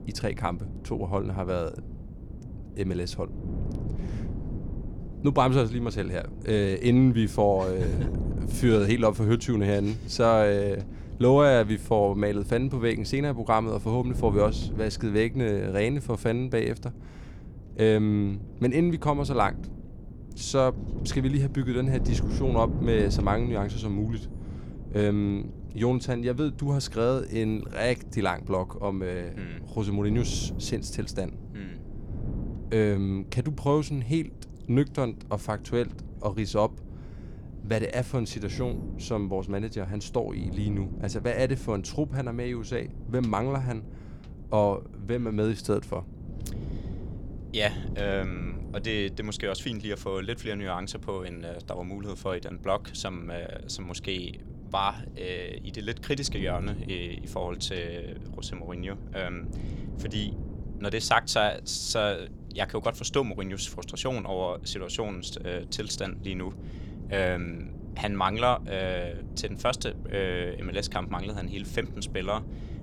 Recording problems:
wind noise on the microphone; occasional gusts; 20 dB below the speech

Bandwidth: 18 kHz